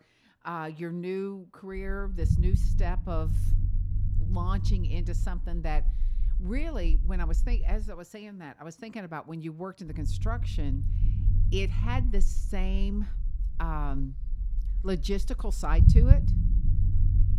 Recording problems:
low rumble; loud; from 2 to 8 s and from 10 s on; 6 dB below the speech

